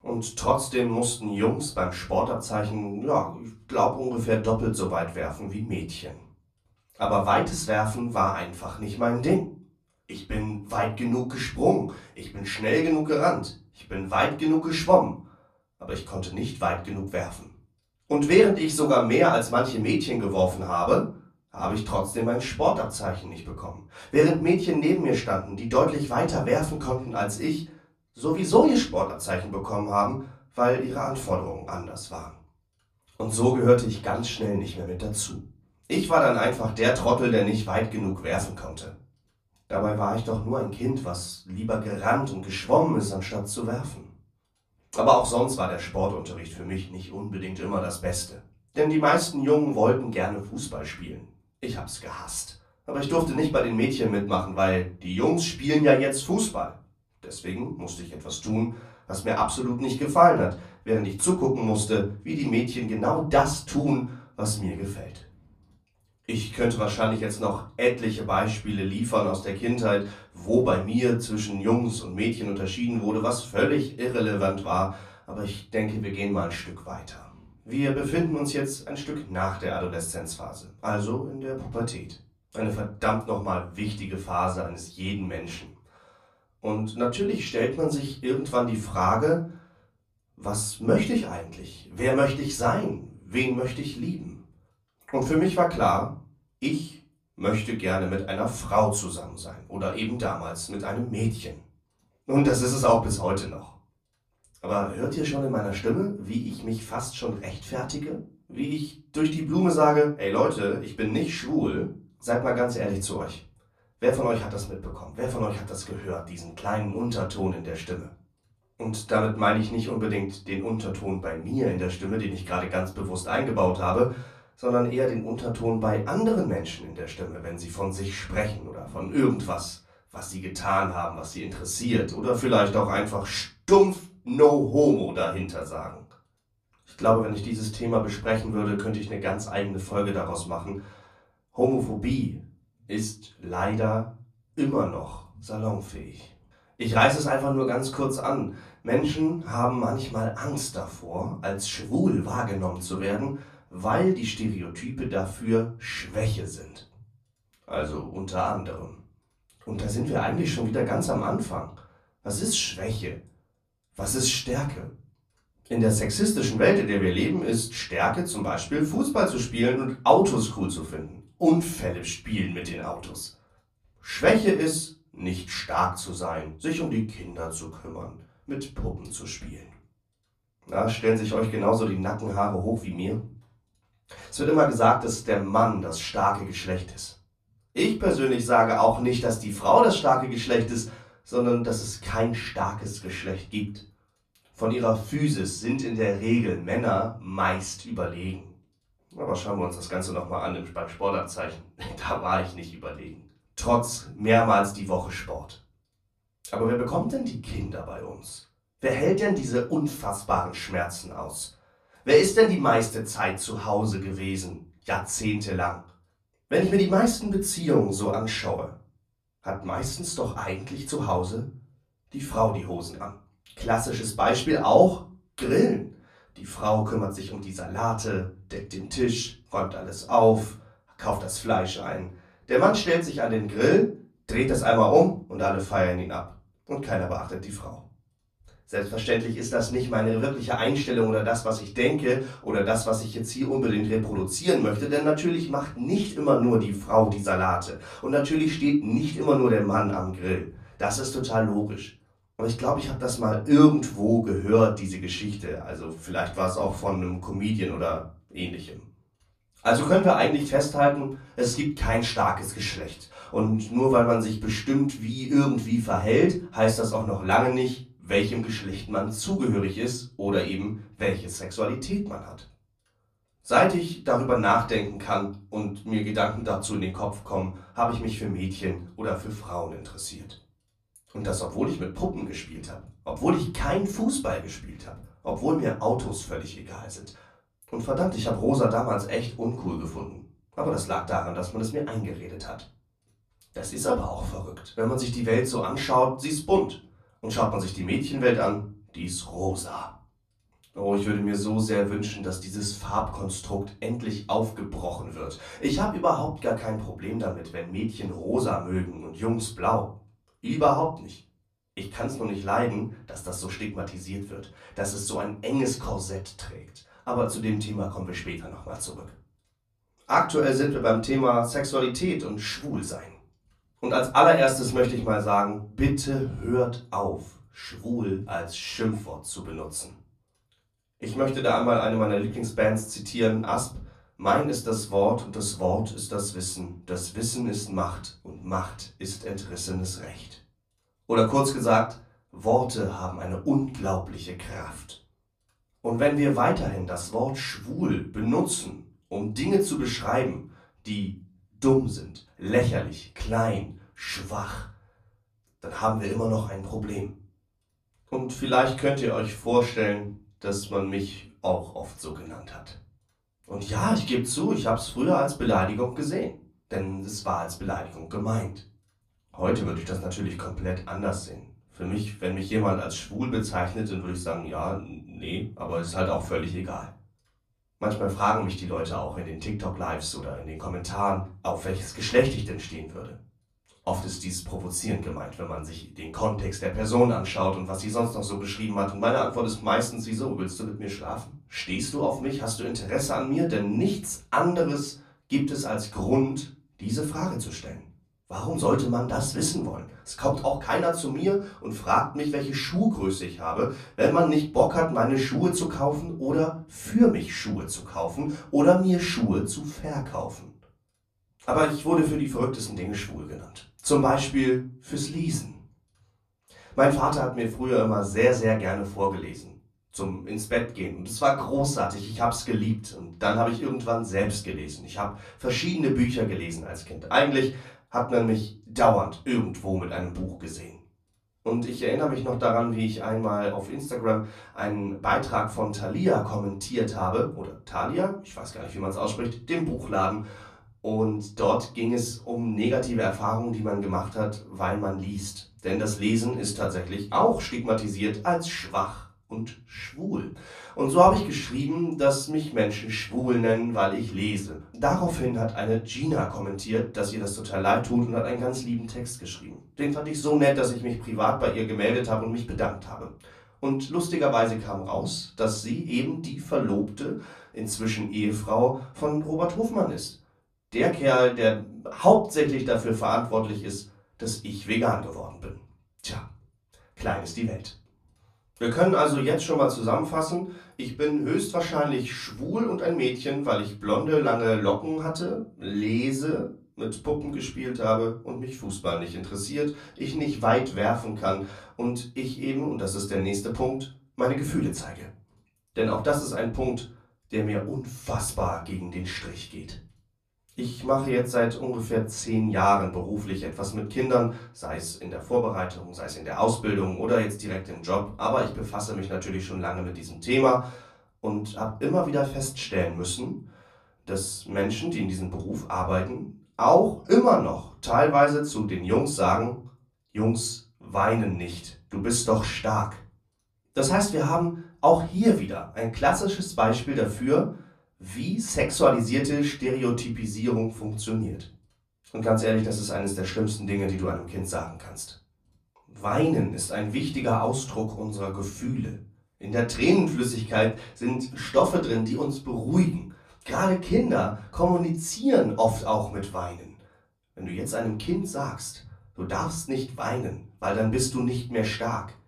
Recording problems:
off-mic speech; far
room echo; slight; dies away in 0.3 s

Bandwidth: 14.5 kHz